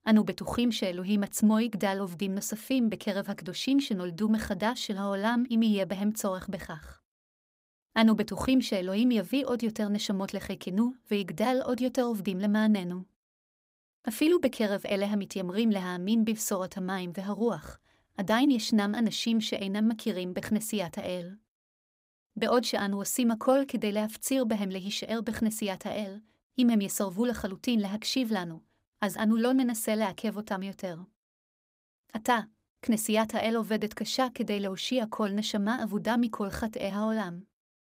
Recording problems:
none

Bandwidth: 15.5 kHz